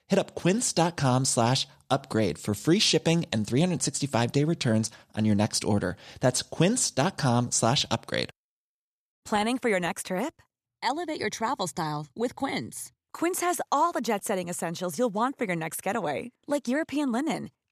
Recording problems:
none

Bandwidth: 14.5 kHz